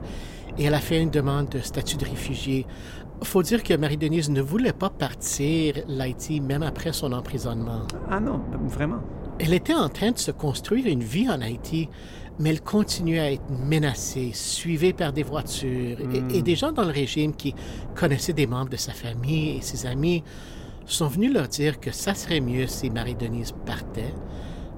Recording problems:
wind noise on the microphone; occasional gusts; 15 dB below the speech

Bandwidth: 16 kHz